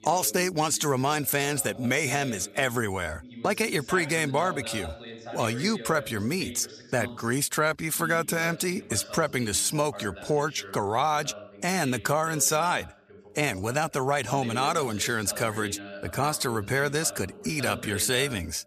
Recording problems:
voice in the background; noticeable; throughout; 15 dB below the speech

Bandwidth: 14.5 kHz